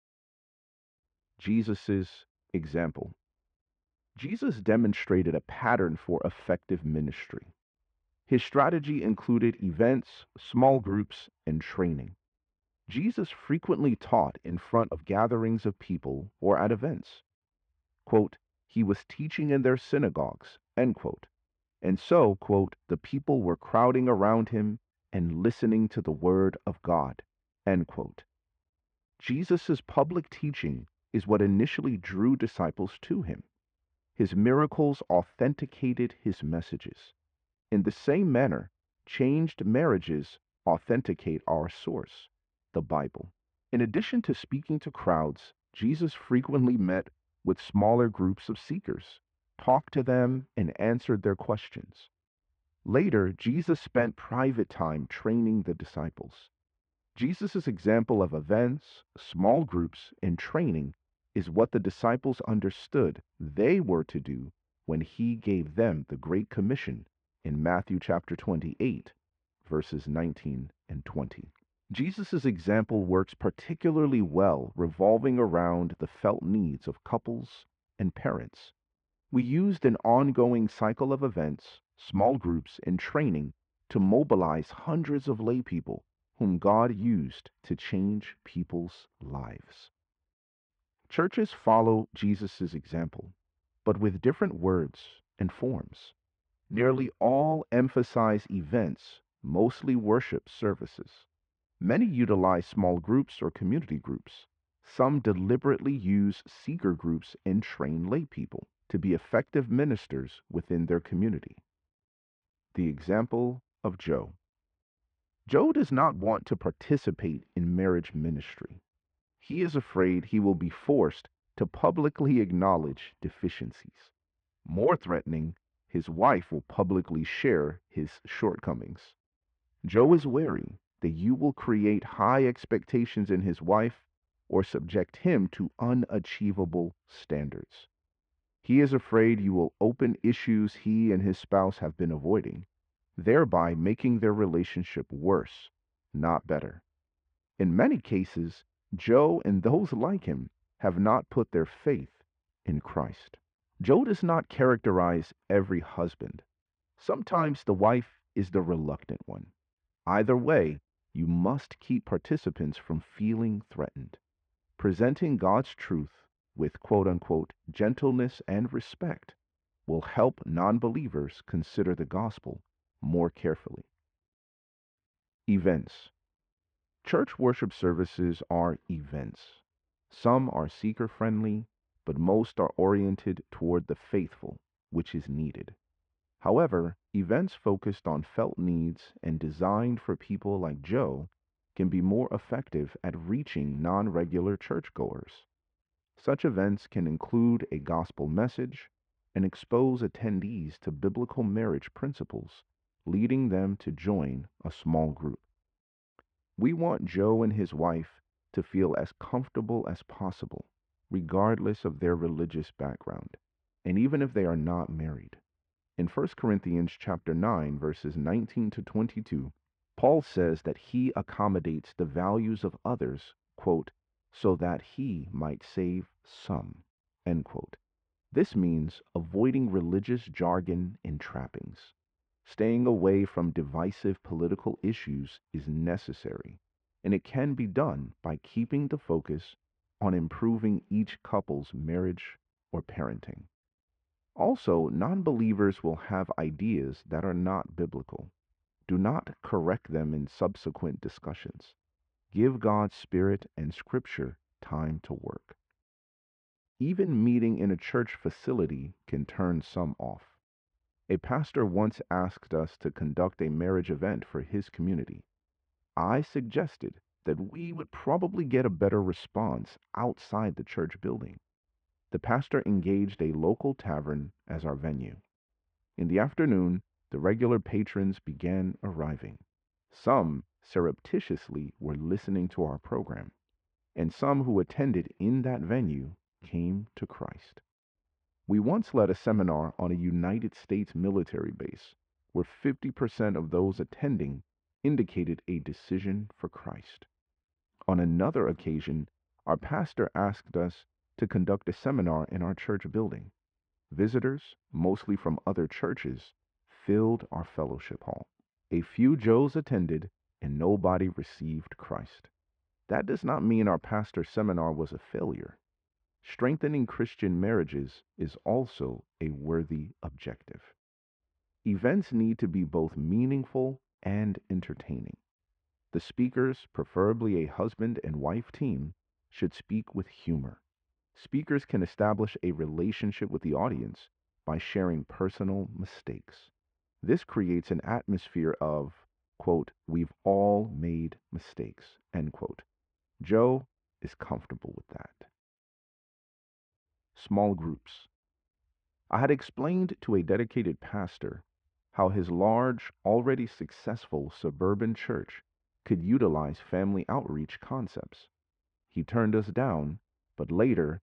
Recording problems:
muffled; very; fading above 2.5 kHz

